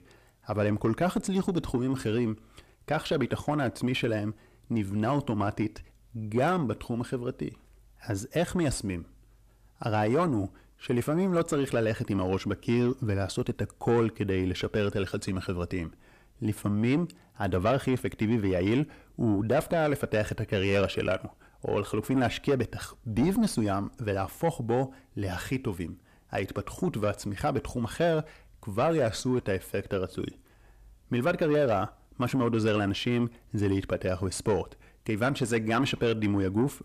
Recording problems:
distortion; slight; 10 dB below the speech

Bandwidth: 14.5 kHz